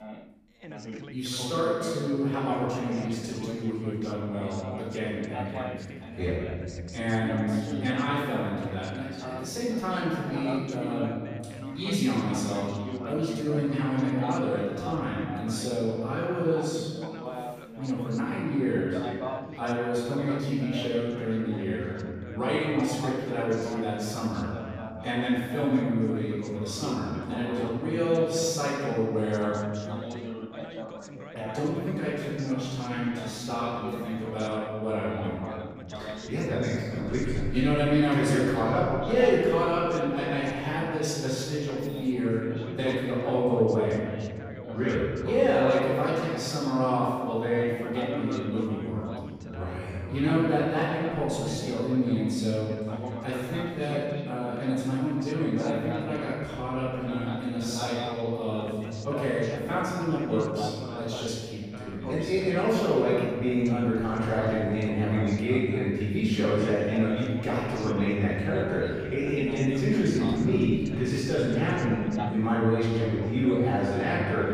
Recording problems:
room echo; strong; dies away in 1.8 s
off-mic speech; far
background chatter; noticeable; throughout; 2 voices, 10 dB below the speech

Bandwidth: 15 kHz